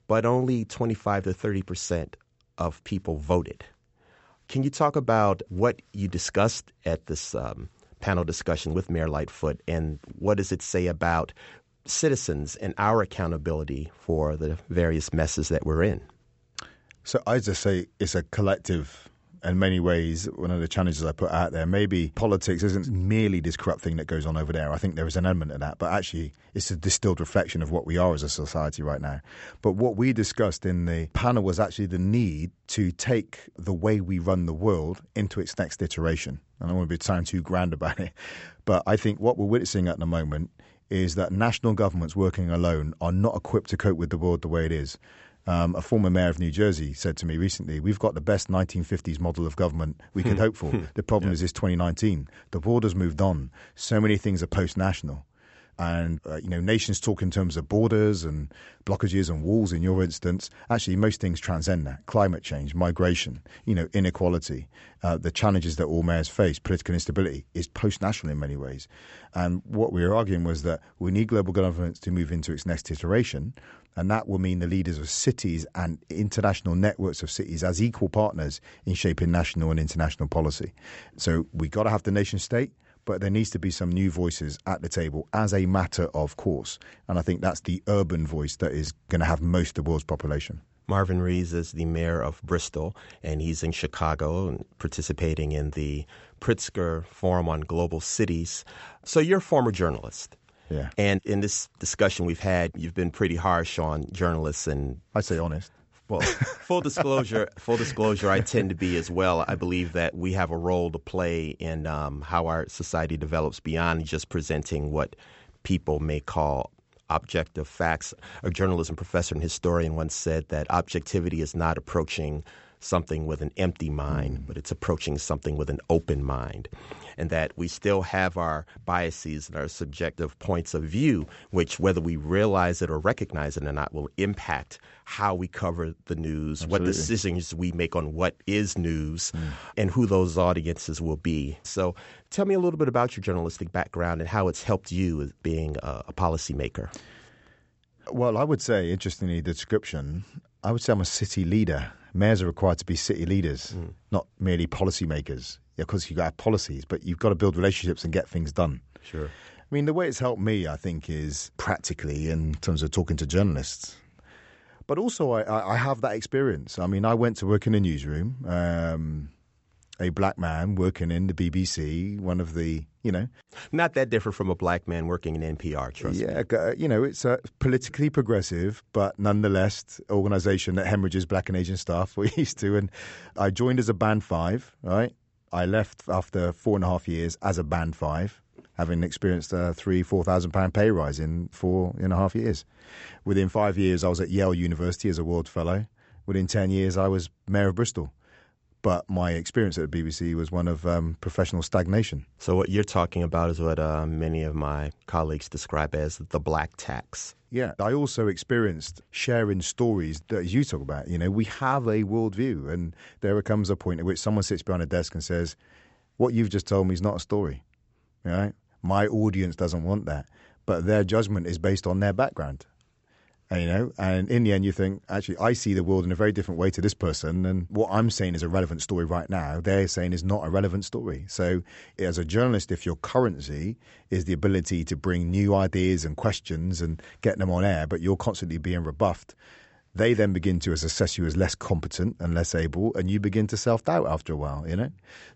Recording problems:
high frequencies cut off; noticeable; nothing above 8 kHz

